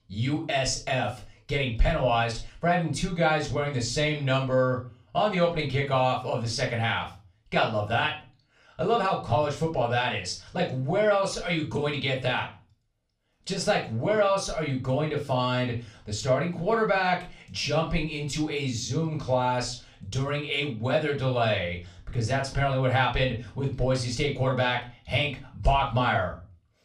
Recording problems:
off-mic speech; far
room echo; very slight; dies away in 0.3 s

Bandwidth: 15 kHz